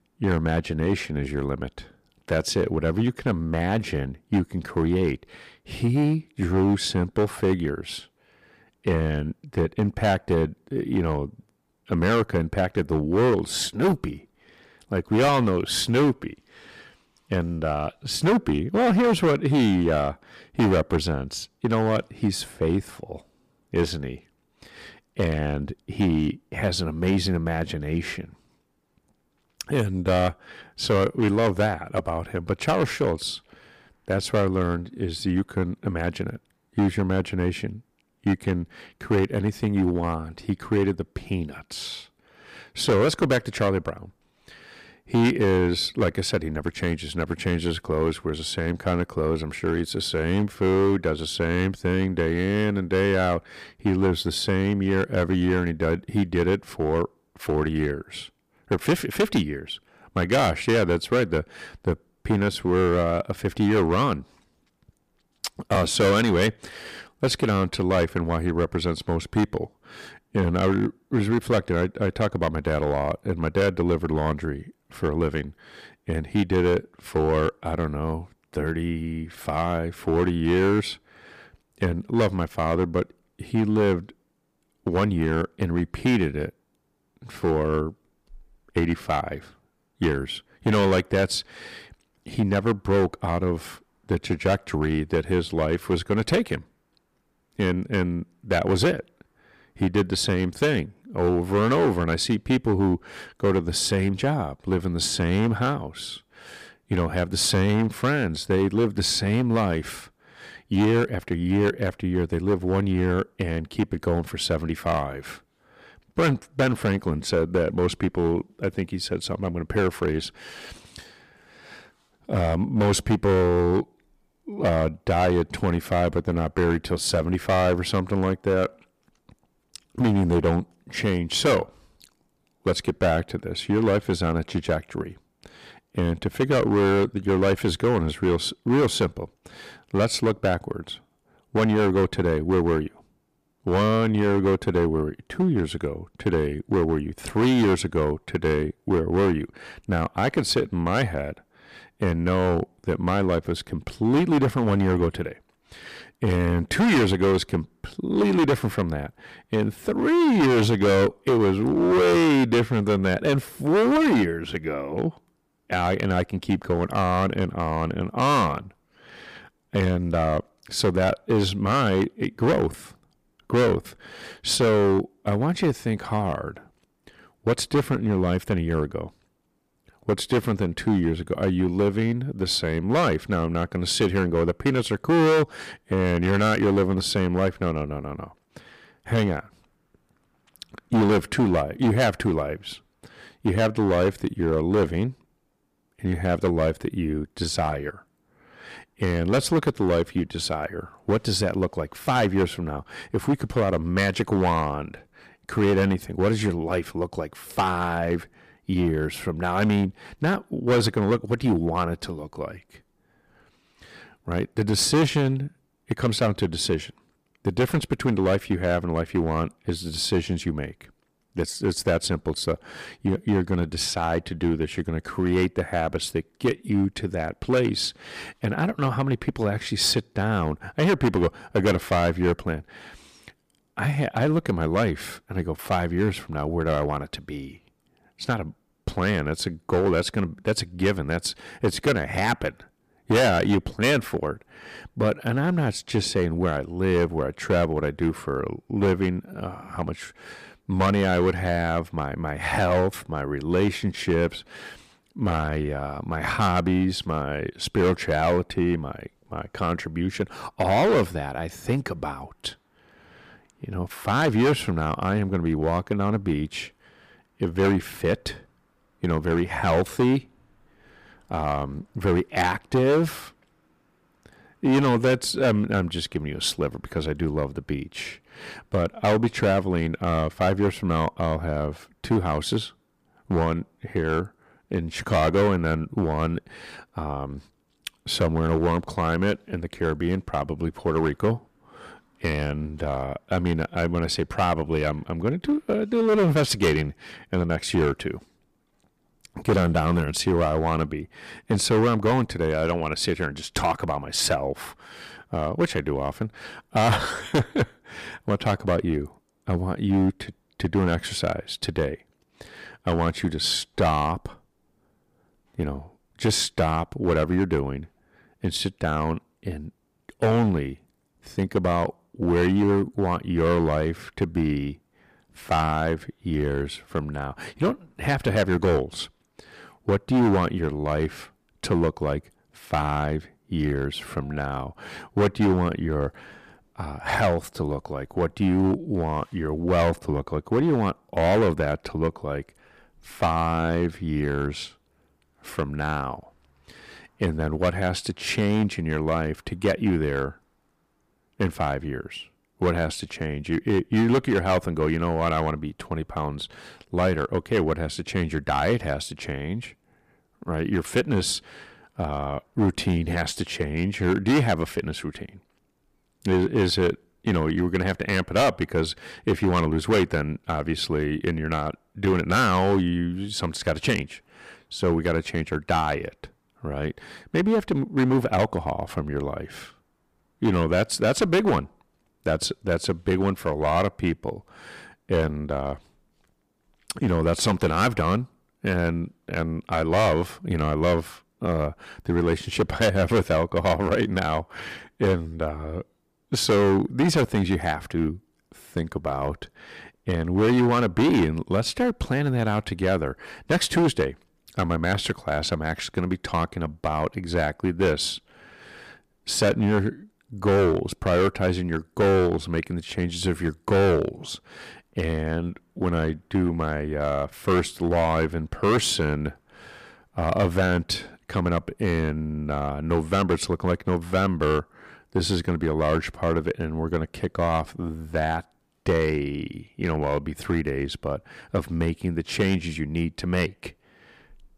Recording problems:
distortion; heavy; 7% of the sound clipped

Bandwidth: 15 kHz